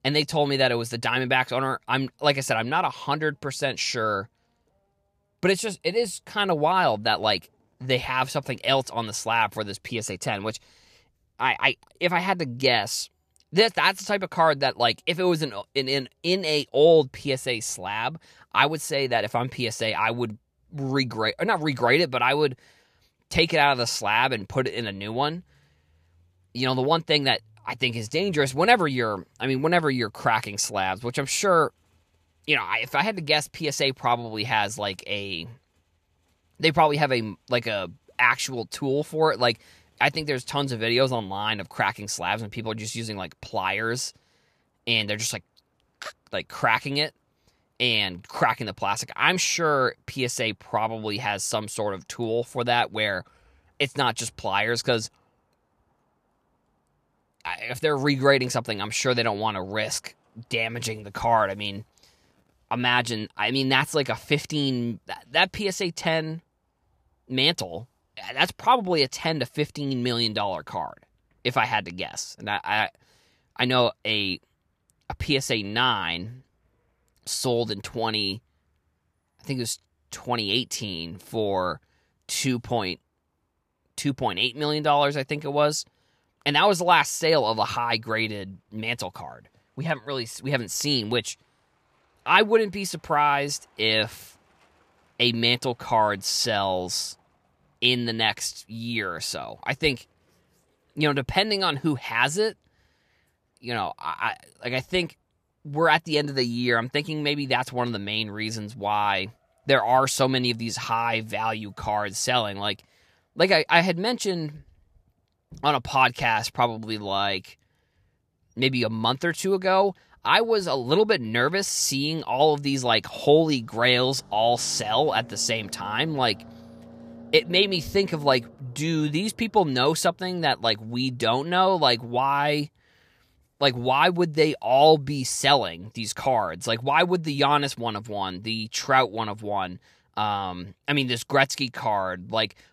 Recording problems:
traffic noise; faint; throughout; 30 dB below the speech

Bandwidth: 14.5 kHz